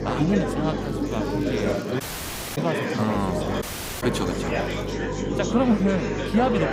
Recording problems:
electrical hum; loud; until 2 s and from 3 s on; 50 Hz, 7 dB below the speech
chatter from many people; loud; throughout; 2 dB below the speech
crackling; faint; from 1 to 5 s; 25 dB below the speech
audio cutting out; at 2 s for 0.5 s and at 3.5 s

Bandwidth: 15.5 kHz